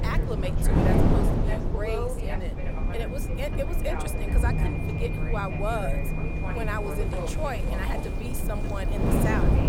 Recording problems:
wind noise on the microphone; heavy; 2 dB below the speech
high-pitched whine; loud; from 2.5 s on; 2.5 kHz, 9 dB below the speech
traffic noise; loud; from 6.5 s on; 6 dB below the speech
voice in the background; loud; throughout; 5 dB below the speech
low rumble; loud; throughout; 9 dB below the speech

